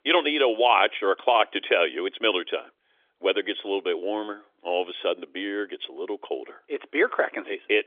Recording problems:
phone-call audio; nothing above 3.5 kHz

